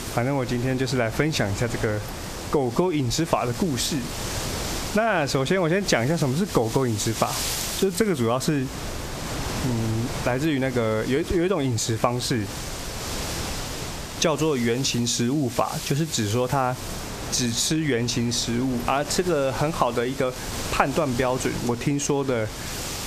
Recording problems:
squashed, flat; heavily
wind noise on the microphone; heavy; 9 dB below the speech

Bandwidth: 14.5 kHz